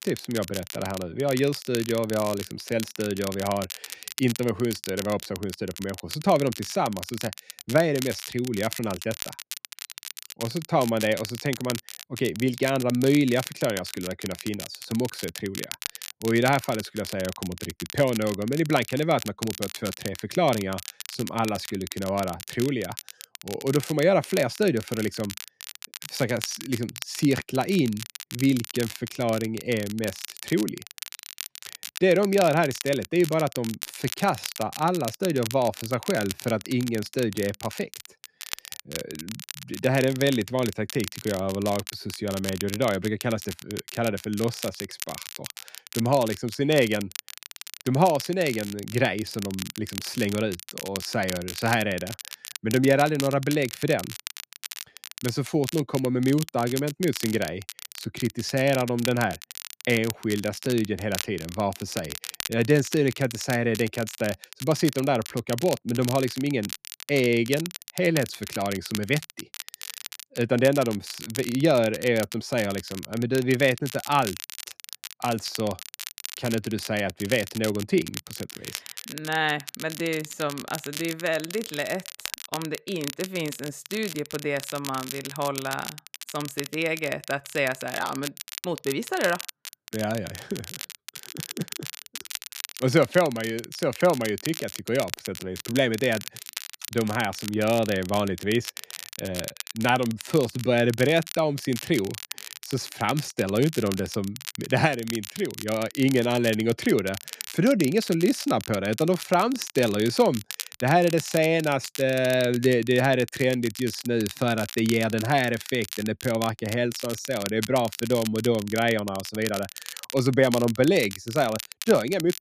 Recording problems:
crackle, like an old record; noticeable; 10 dB below the speech

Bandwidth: 14.5 kHz